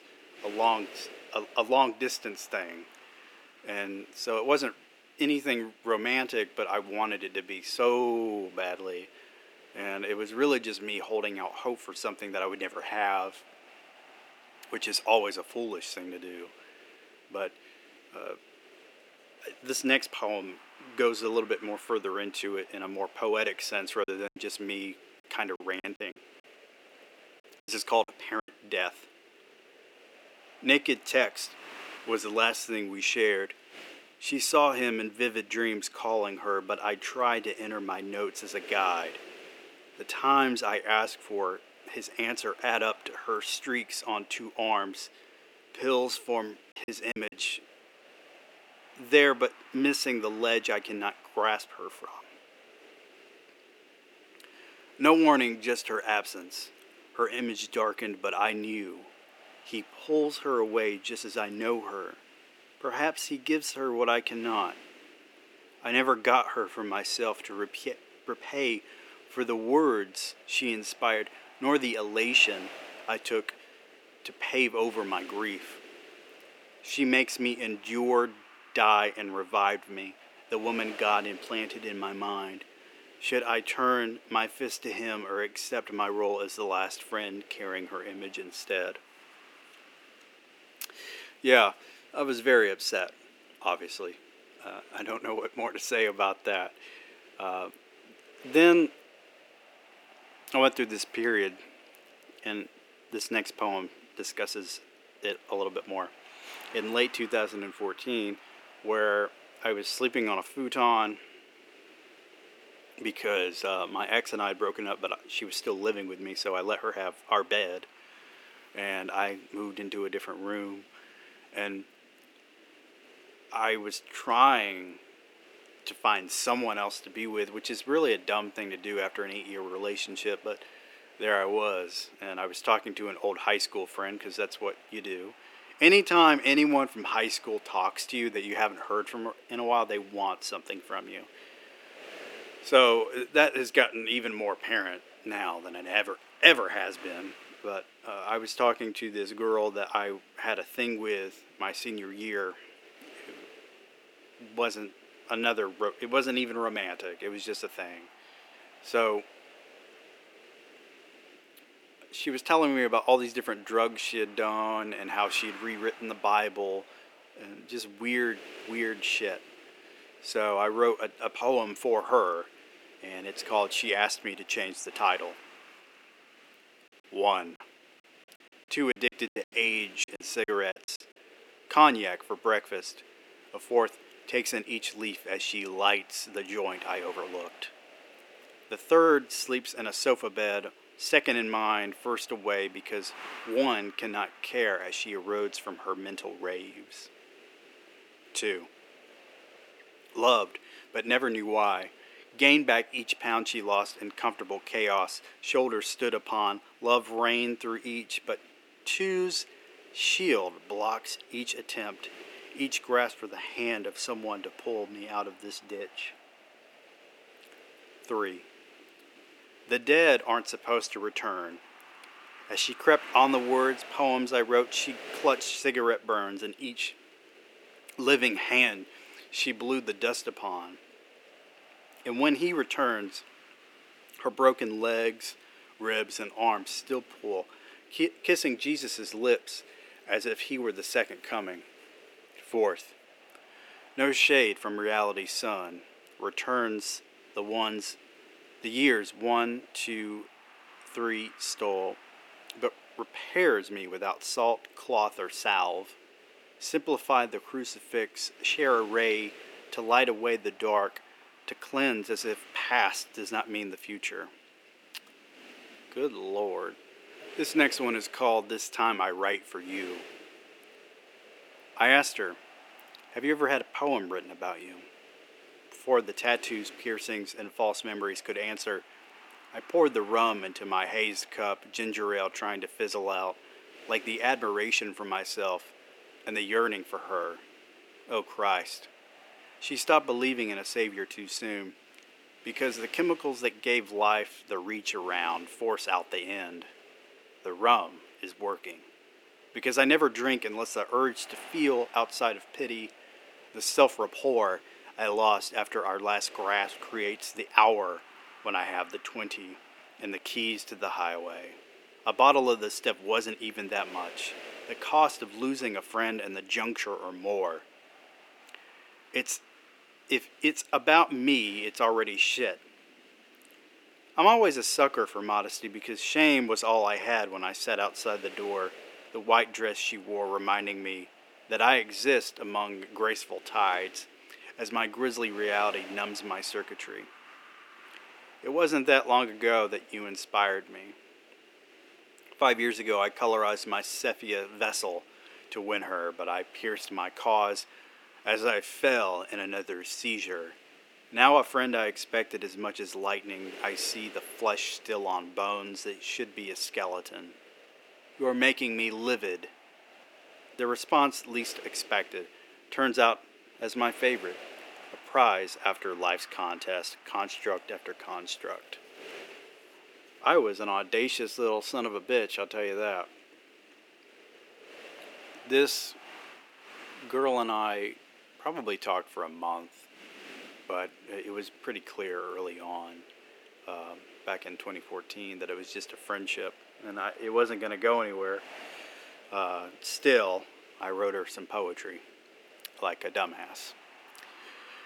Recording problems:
thin; somewhat; fading below 300 Hz
wind noise on the microphone; occasional gusts; 25 dB below the speech
choppy; very; from 24 to 28 s, at 47 s and from 2:58 to 3:01; 18% of the speech affected

